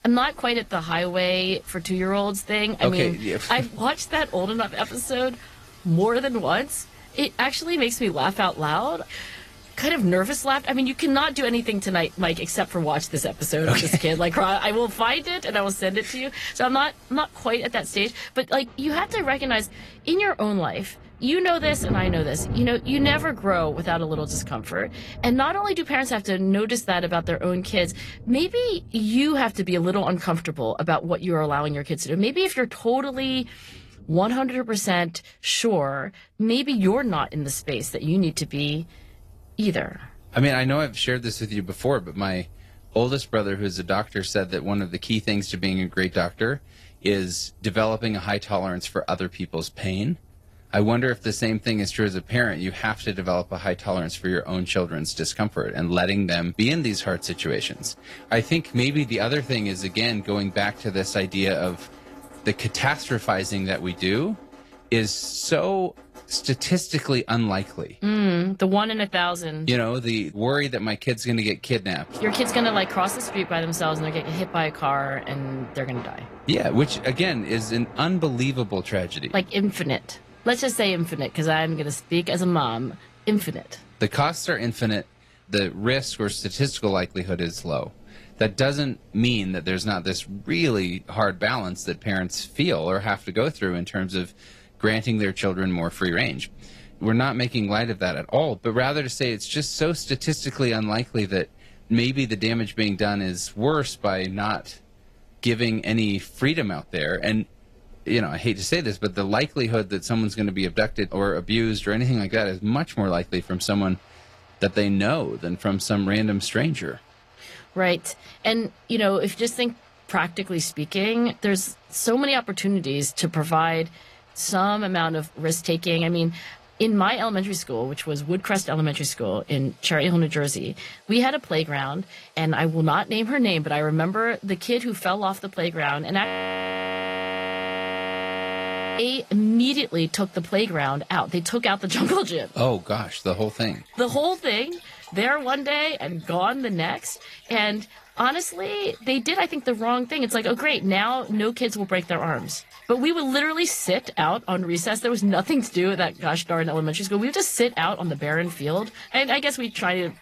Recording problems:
garbled, watery; slightly; nothing above 13 kHz
rain or running water; faint; throughout; 20 dB below the speech
audio freezing; at 2:16 for 2.5 s

